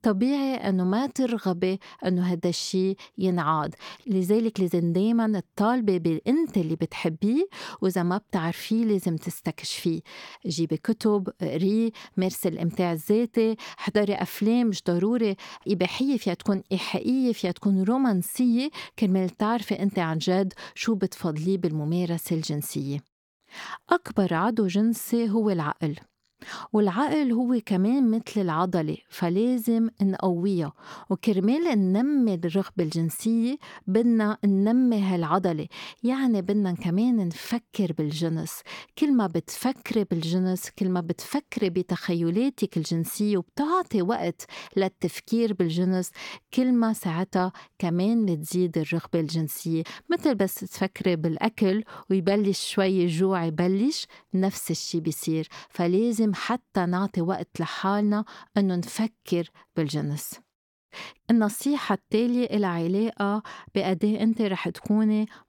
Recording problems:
none

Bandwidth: 18 kHz